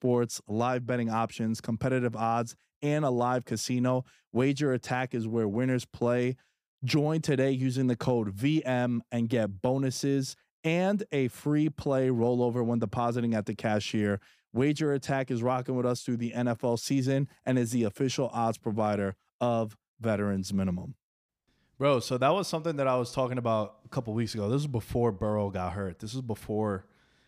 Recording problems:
none

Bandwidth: 15 kHz